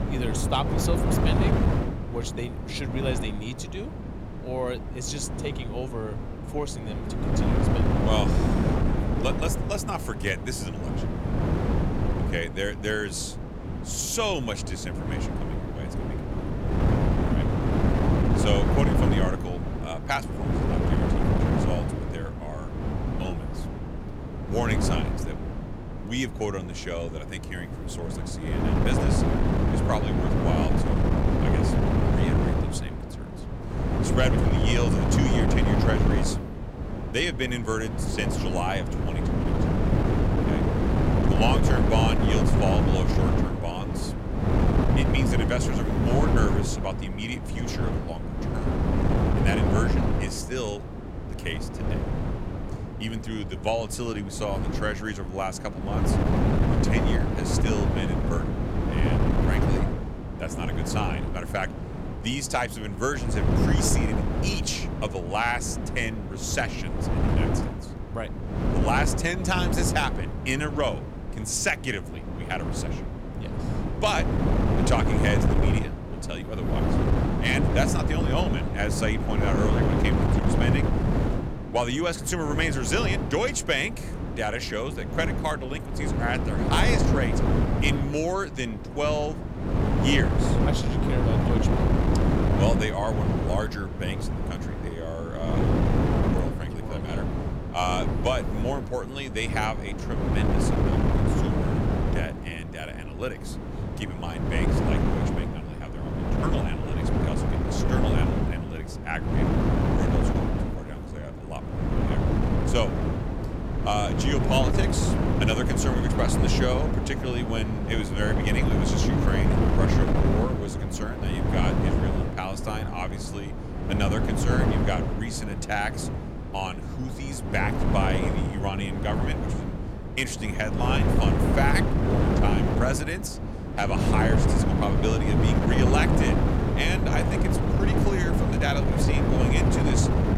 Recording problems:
wind noise on the microphone; heavy; 1 dB below the speech

